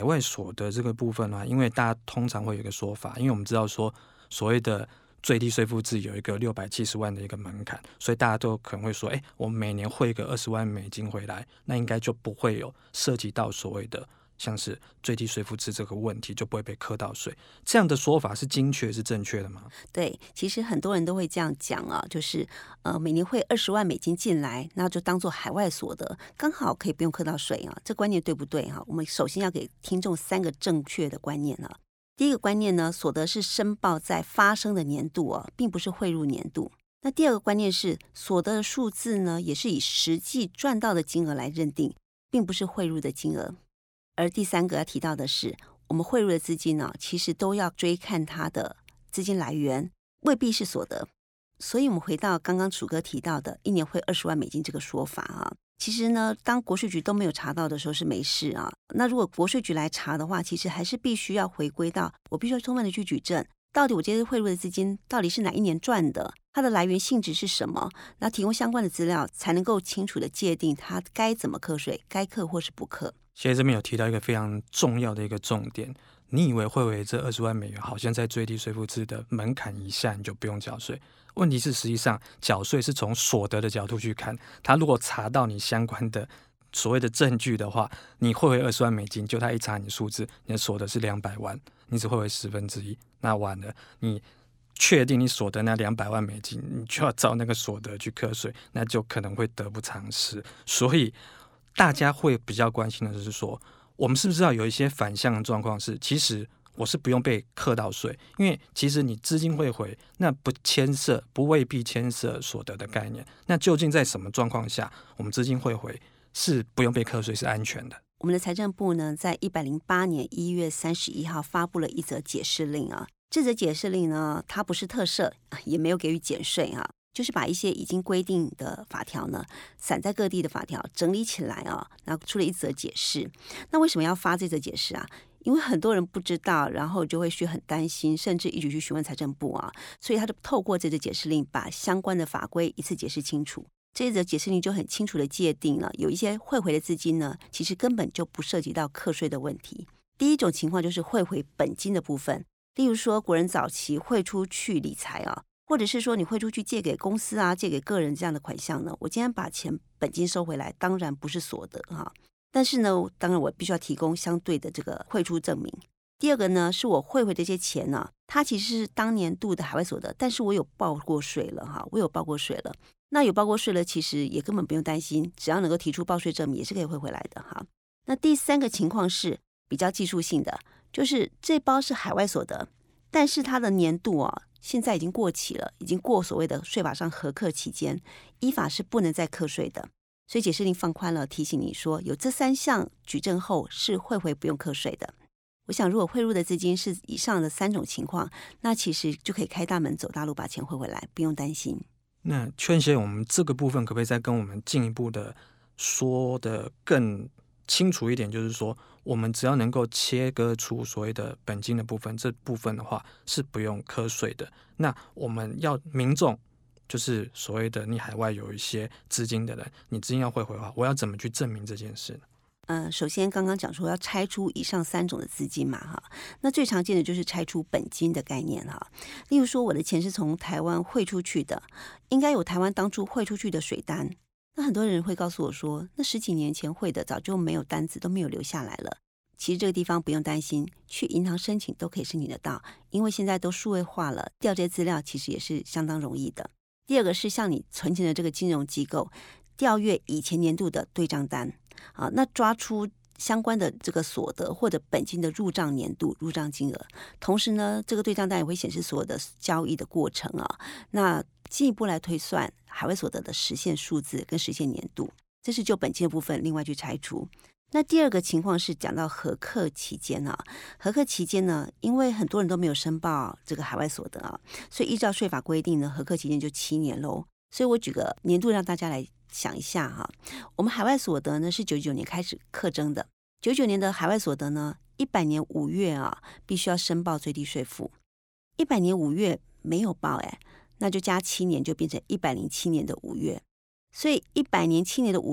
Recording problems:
abrupt cut into speech; at the start and the end

